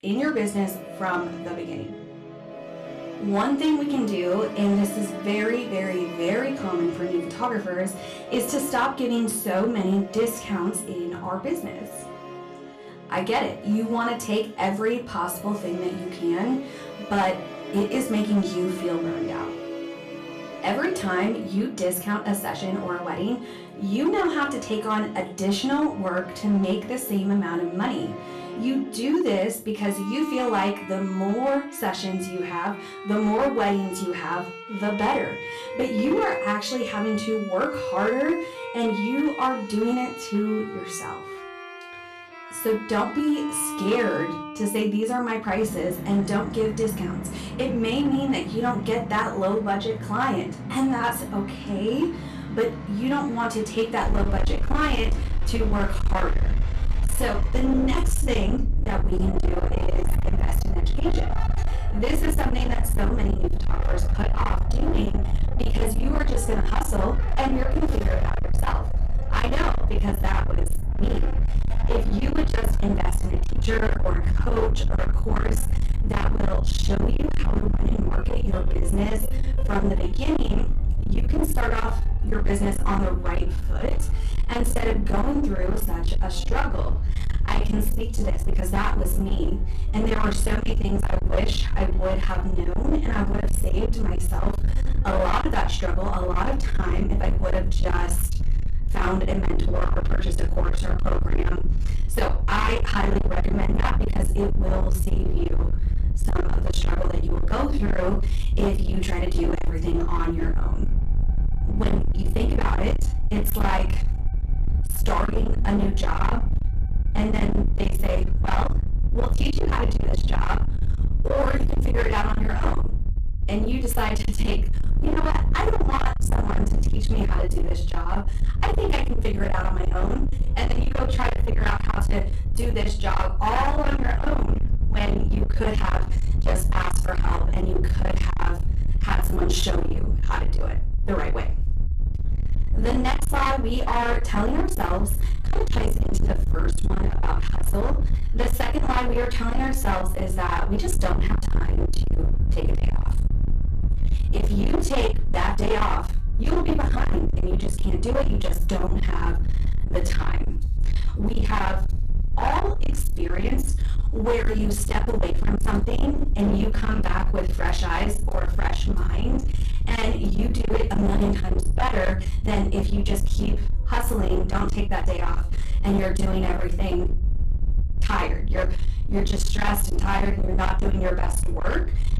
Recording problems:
distortion; heavy; 32% of the sound clipped
off-mic speech; far
room echo; very slight; dies away in 0.3 s
low rumble; loud; from 54 s on; 7 dB below the speech
background music; noticeable; throughout; 10 dB below the speech

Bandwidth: 14.5 kHz